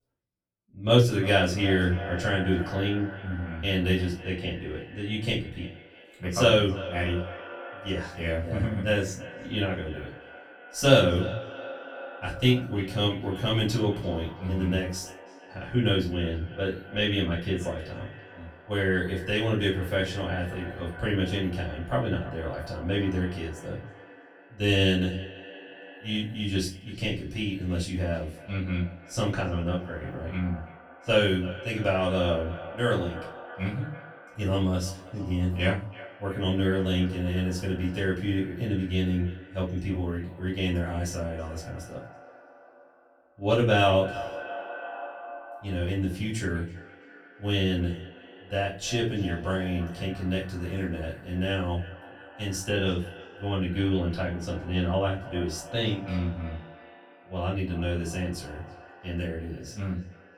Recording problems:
off-mic speech; far
echo of what is said; noticeable; throughout; 330 ms later, 15 dB below the speech
room echo; slight; dies away in 0.3 s

